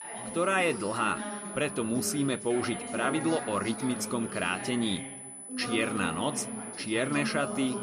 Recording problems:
background chatter; loud; throughout; 3 voices, 8 dB below the speech
high-pitched whine; noticeable; throughout; 10 kHz, 10 dB below the speech

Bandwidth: 14.5 kHz